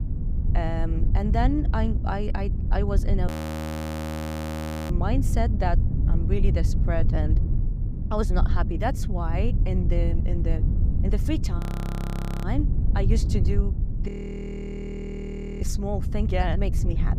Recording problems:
low rumble; loud; throughout; 7 dB below the speech
audio freezing; at 3.5 s for 1.5 s, at 12 s for 1 s and at 14 s for 1.5 s

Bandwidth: 15.5 kHz